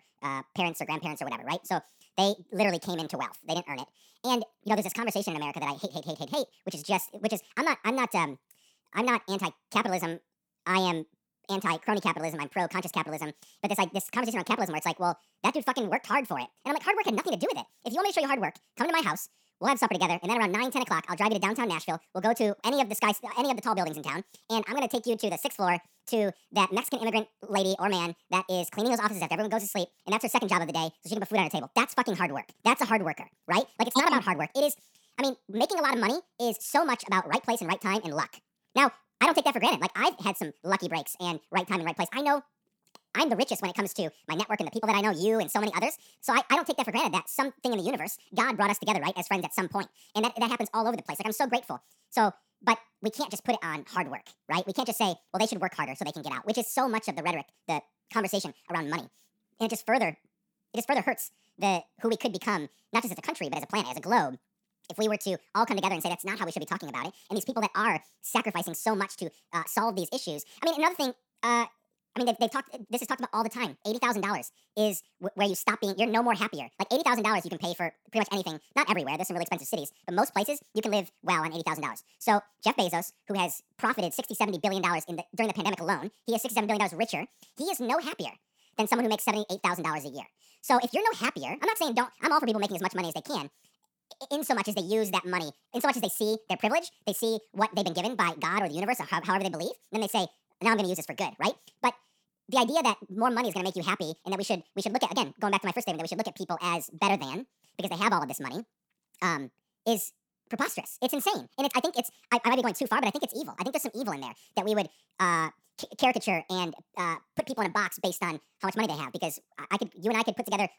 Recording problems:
wrong speed and pitch; too fast and too high; 1.6 times normal speed

